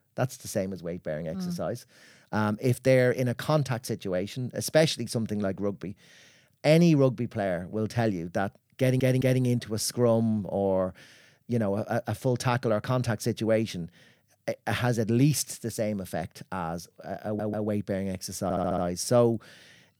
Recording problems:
audio stuttering; at 9 s, at 17 s and at 18 s

